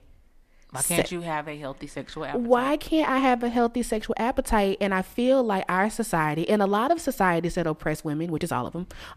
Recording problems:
none

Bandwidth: 14.5 kHz